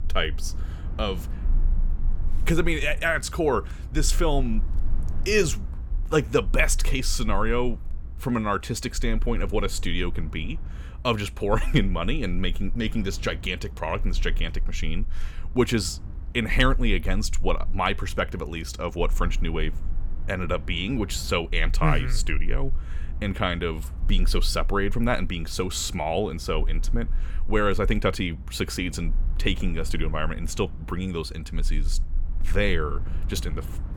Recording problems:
low rumble; faint; throughout; 25 dB below the speech

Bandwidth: 18.5 kHz